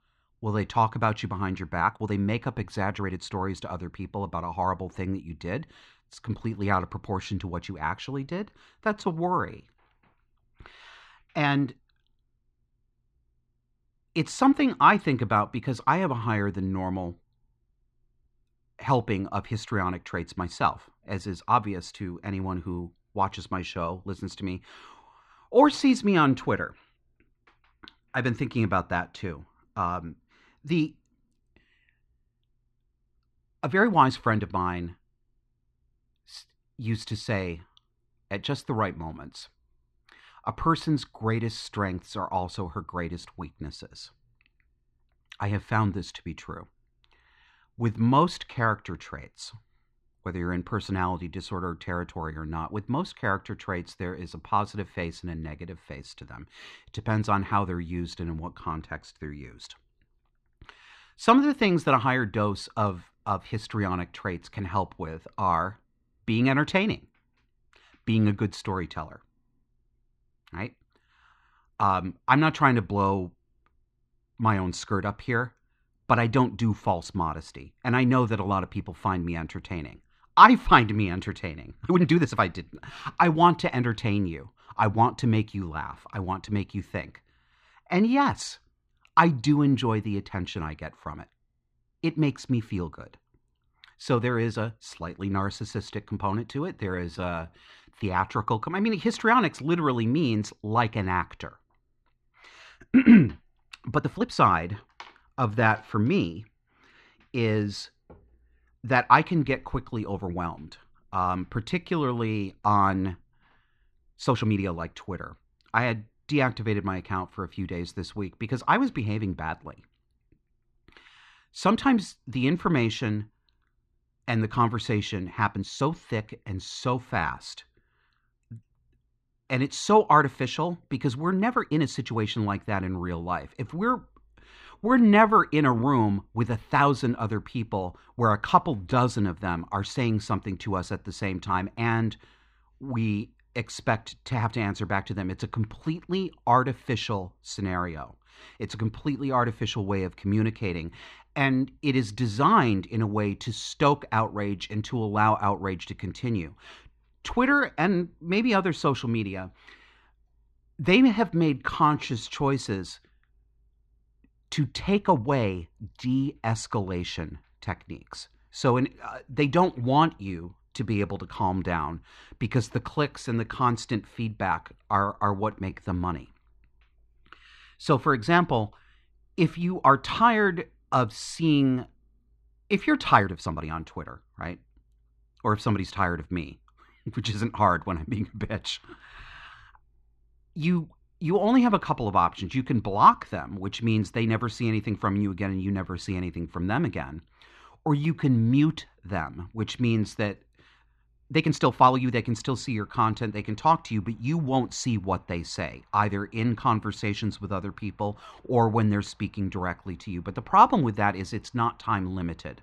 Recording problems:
muffled; slightly; fading above 3 kHz
uneven, jittery; strongly; from 2 s to 3:22

